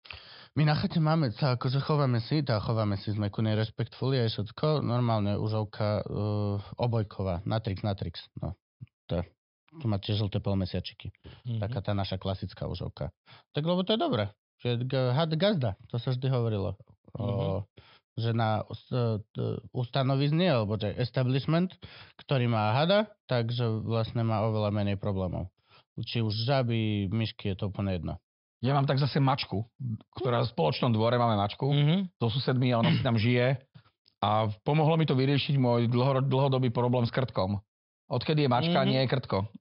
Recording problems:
high frequencies cut off; noticeable; nothing above 5.5 kHz

